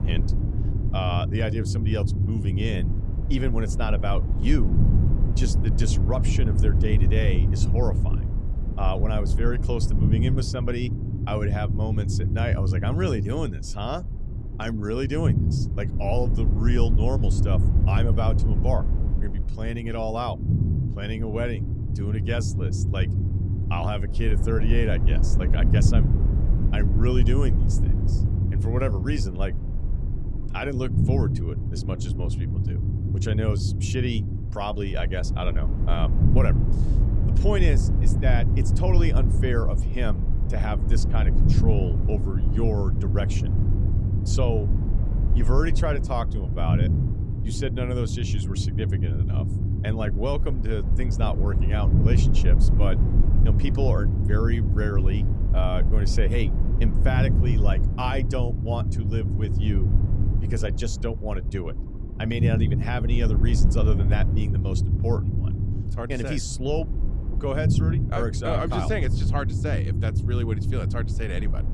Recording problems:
low rumble; loud; throughout; 6 dB below the speech

